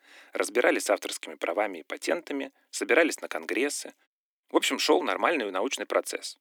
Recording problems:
thin; very; fading below 300 Hz

